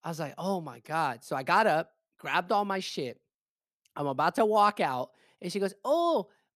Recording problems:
none

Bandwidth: 14.5 kHz